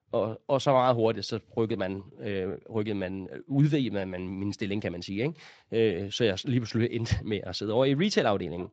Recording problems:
garbled, watery; slightly

